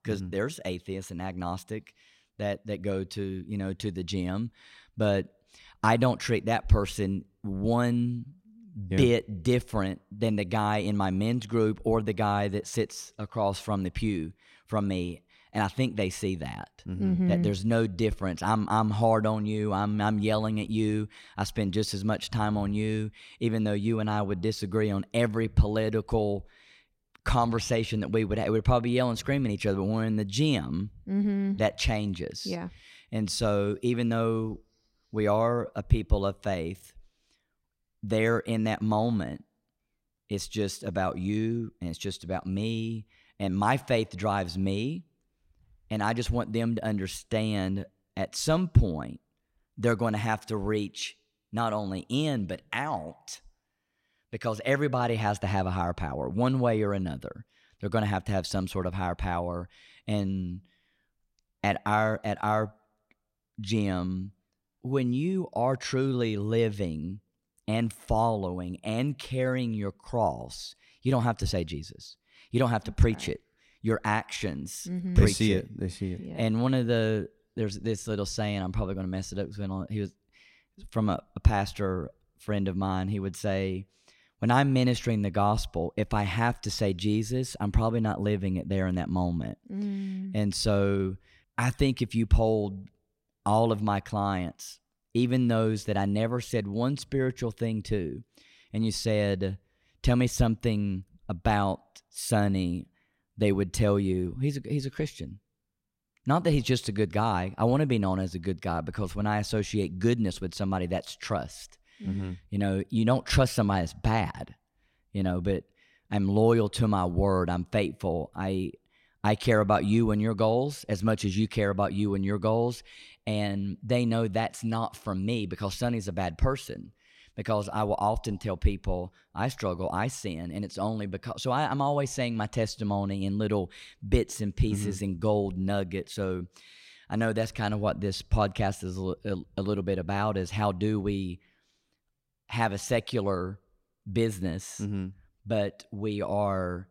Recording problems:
none

